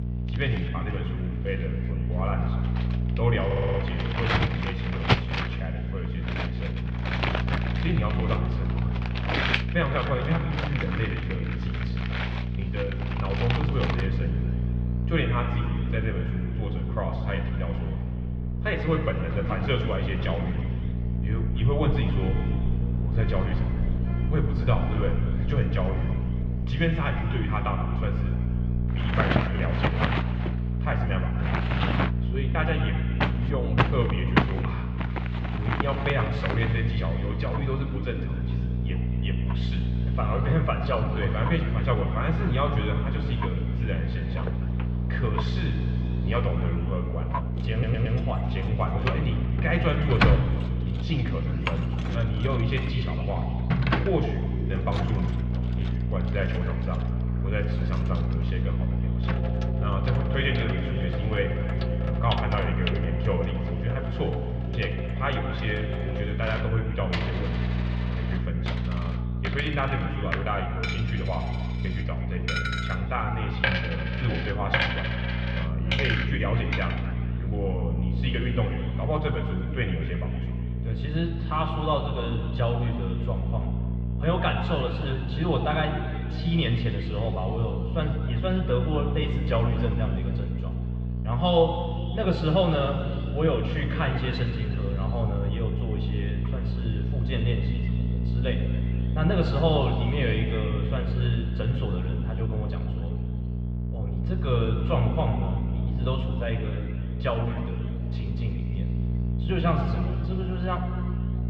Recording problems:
muffled; very; fading above 3 kHz
room echo; noticeable; dies away in 2.5 s
off-mic speech; somewhat distant
electrical hum; loud; throughout; 60 Hz, 9 dB below the speech
household noises; loud; until 1:17; 3 dB below the speech
audio stuttering; at 3.5 s and at 48 s

